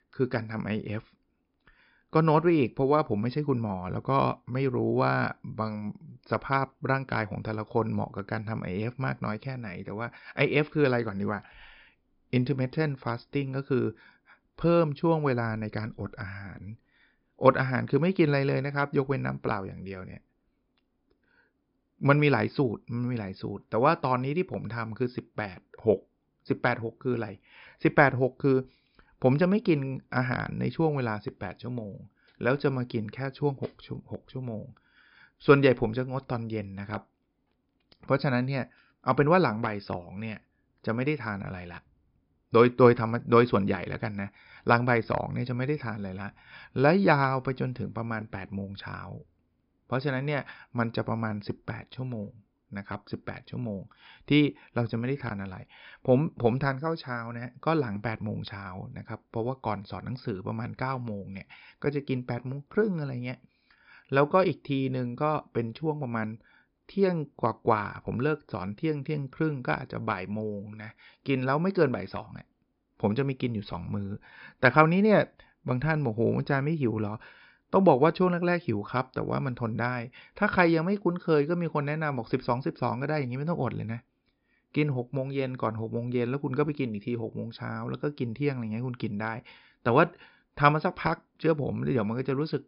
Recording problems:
high frequencies cut off; noticeable; nothing above 5.5 kHz

